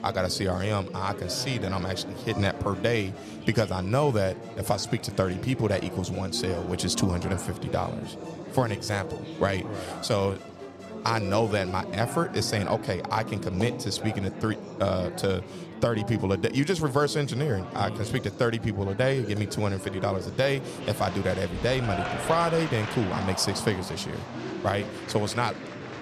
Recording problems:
murmuring crowd; loud; throughout; 9 dB below the speech
background music; faint; throughout; 20 dB below the speech

